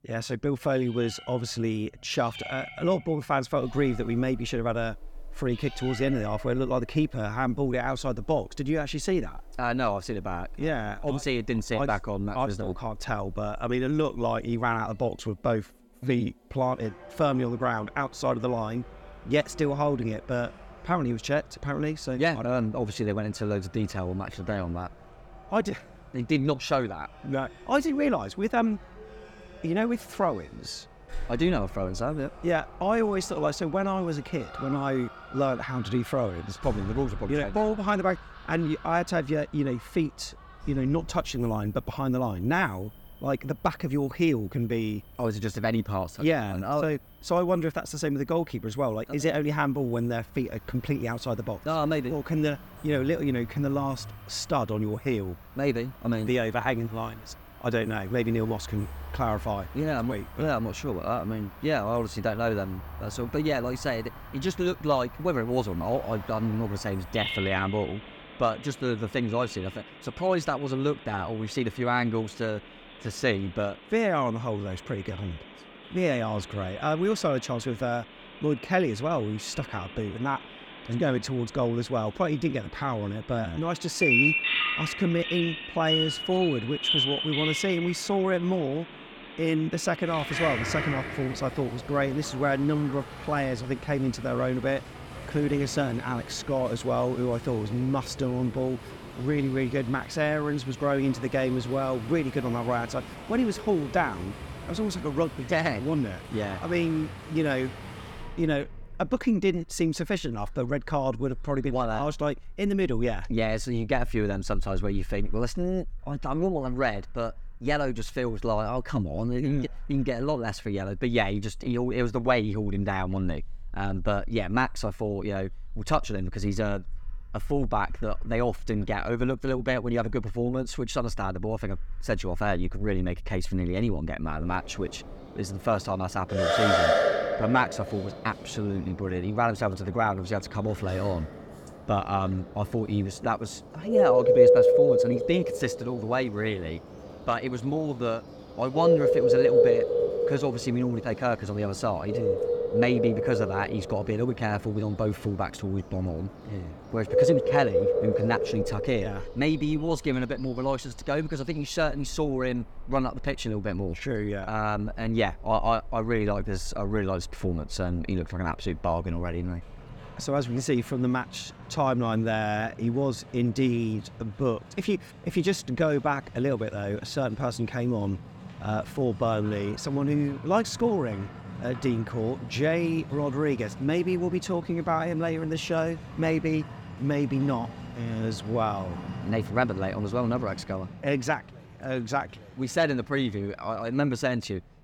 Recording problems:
animal sounds; loud; throughout; 3 dB below the speech

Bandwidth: 18 kHz